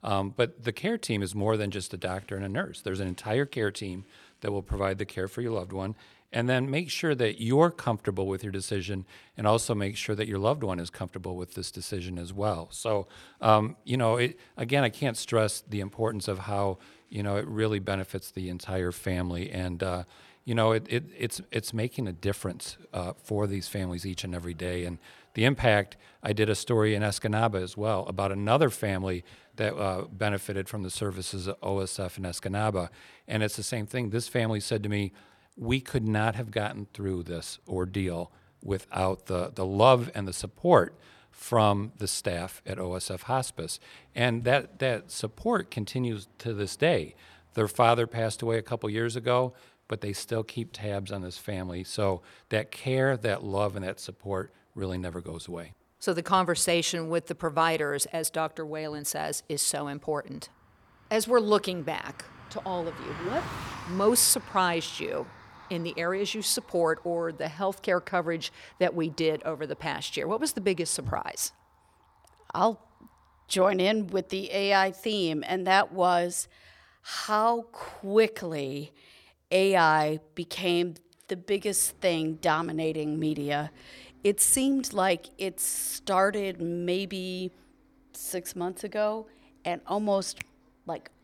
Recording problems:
traffic noise; faint; throughout; 25 dB below the speech

